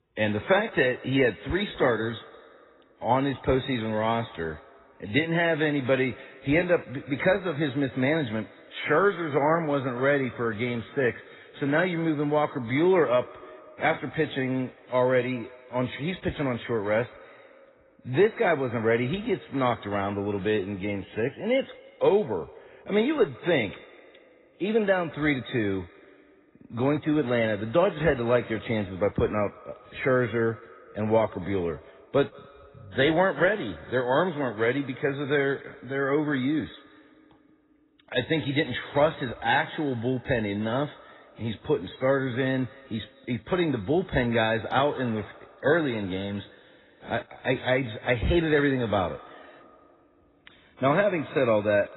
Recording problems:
garbled, watery; badly; nothing above 4 kHz
echo of what is said; faint; throughout; 170 ms later, 20 dB below the speech

